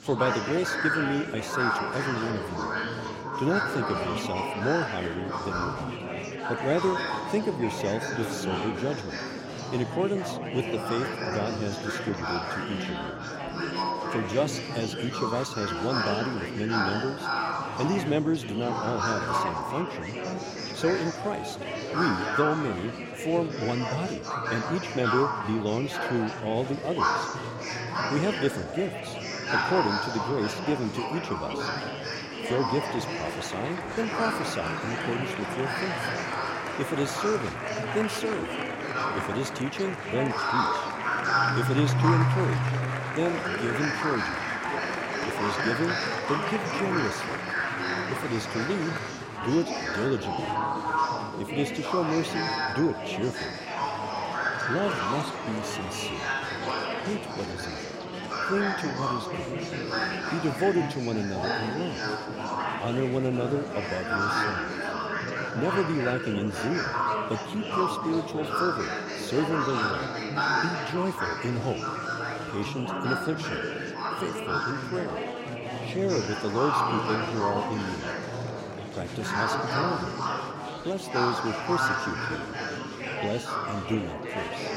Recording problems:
murmuring crowd; very loud; throughout; 1 dB above the speech

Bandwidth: 16 kHz